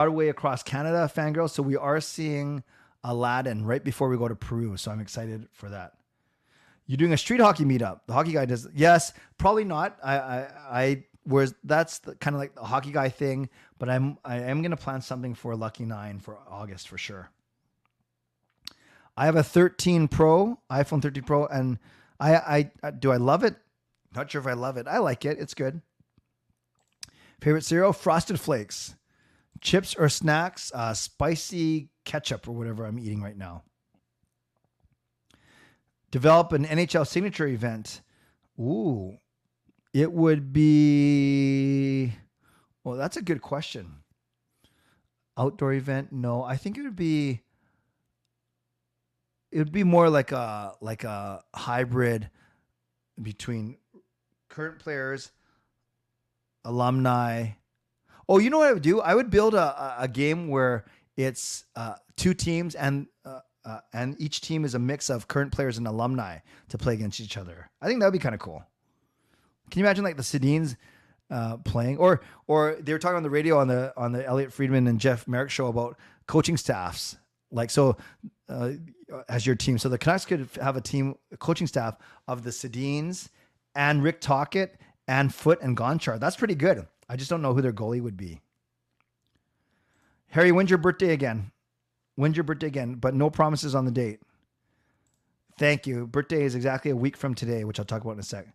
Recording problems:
abrupt cut into speech; at the start

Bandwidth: 13.5 kHz